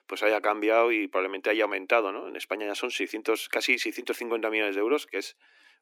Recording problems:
thin; somewhat; fading below 300 Hz

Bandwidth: 17 kHz